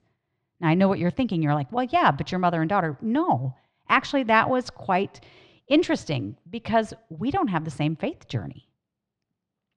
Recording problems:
muffled; slightly; fading above 3 kHz

